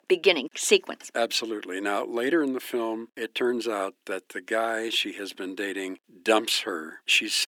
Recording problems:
thin; somewhat; fading below 300 Hz

